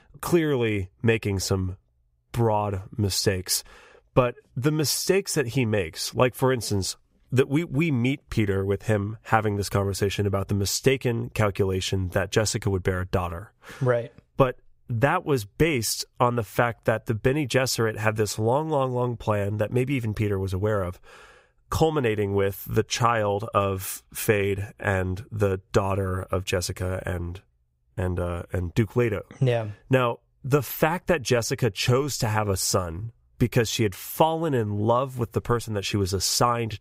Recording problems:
none

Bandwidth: 15.5 kHz